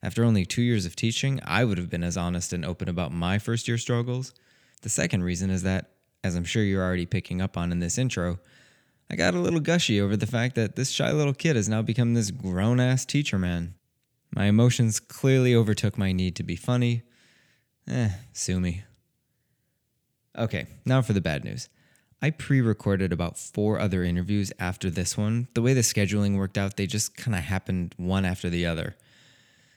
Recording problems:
none

